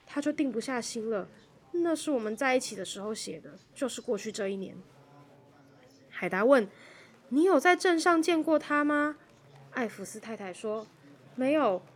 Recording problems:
murmuring crowd; faint; throughout; 30 dB below the speech

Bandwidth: 17 kHz